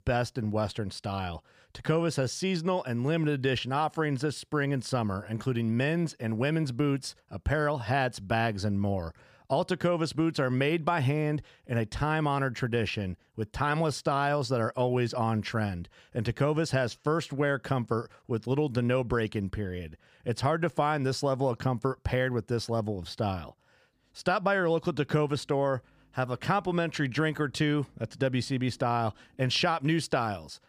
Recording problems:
none

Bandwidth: 15 kHz